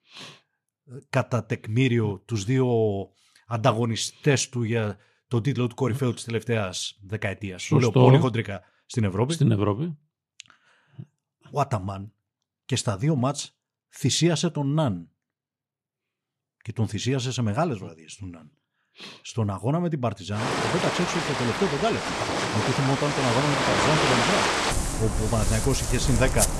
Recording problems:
rain or running water; very faint; from 20 s on; as loud as the speech

